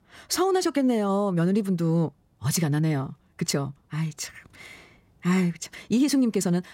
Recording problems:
wrong speed, natural pitch; too fast; 1.5 times normal speed

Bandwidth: 16 kHz